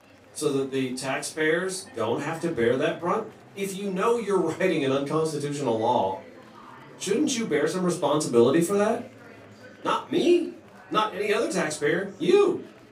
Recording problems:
off-mic speech; far
room echo; slight; dies away in 0.3 s
murmuring crowd; faint; throughout; 25 dB below the speech

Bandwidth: 15.5 kHz